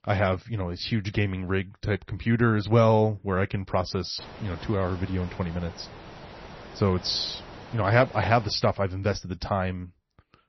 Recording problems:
garbled, watery; slightly; nothing above 6 kHz
hiss; noticeable; from 4 to 8.5 s; 15 dB below the speech

